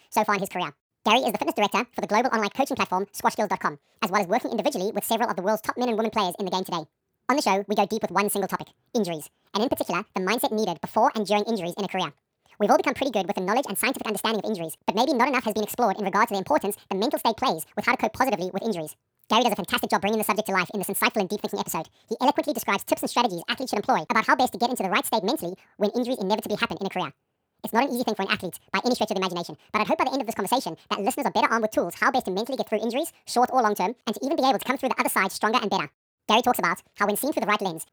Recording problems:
wrong speed and pitch; too fast and too high; 1.7 times normal speed

